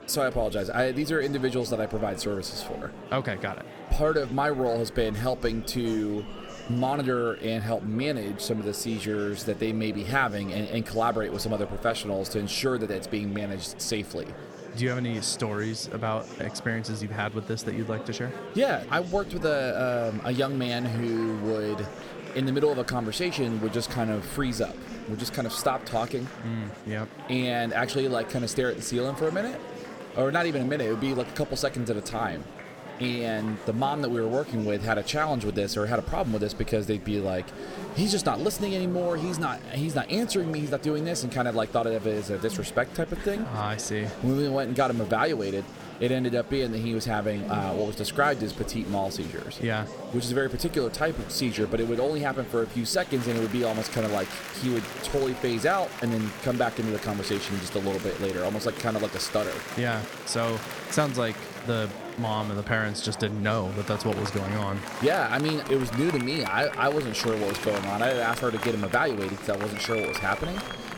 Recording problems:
murmuring crowd; noticeable; throughout; 10 dB below the speech

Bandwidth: 18 kHz